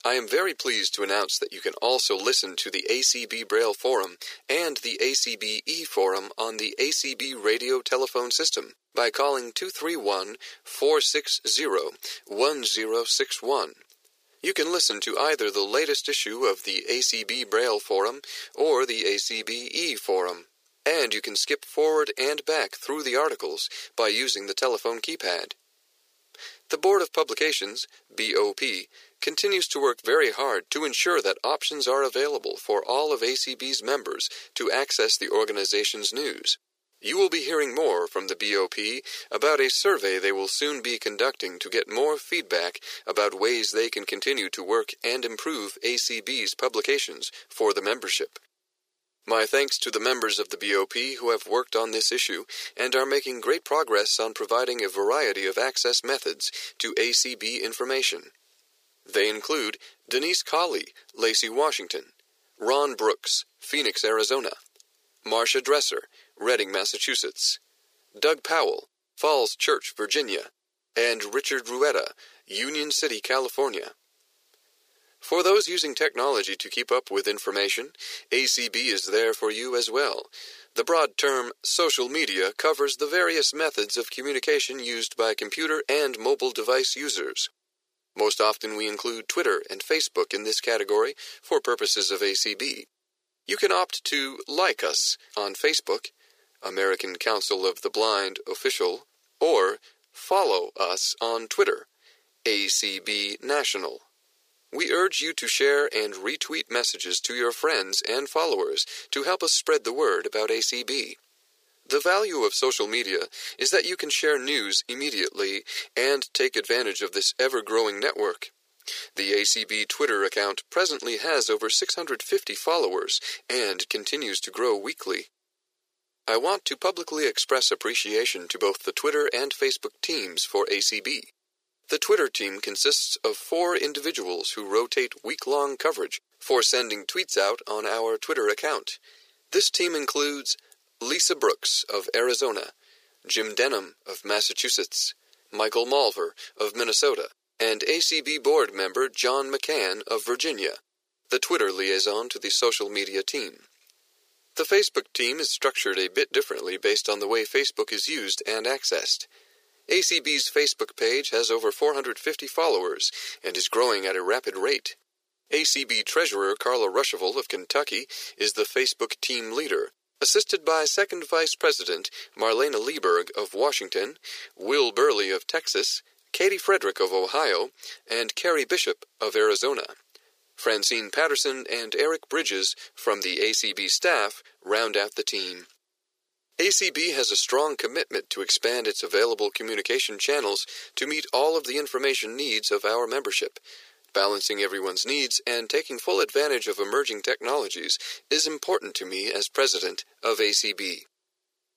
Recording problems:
thin; very; fading below 400 Hz

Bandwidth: 15 kHz